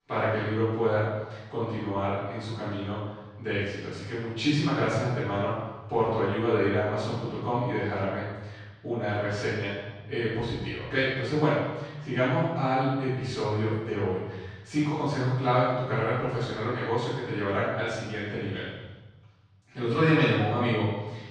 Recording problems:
room echo; strong; dies away in 1.2 s
off-mic speech; far

